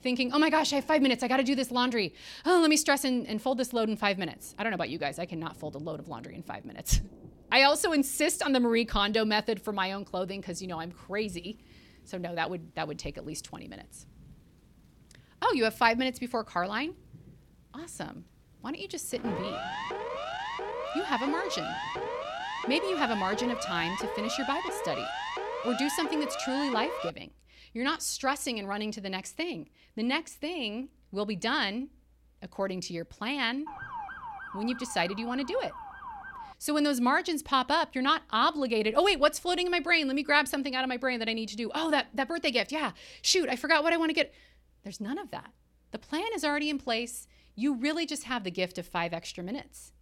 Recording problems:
rain or running water; faint; until 24 s; 25 dB below the speech
siren; noticeable; from 19 to 27 s and from 34 to 37 s; peak 5 dB below the speech

